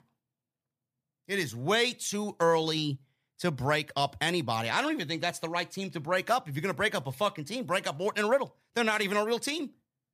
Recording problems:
none

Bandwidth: 15 kHz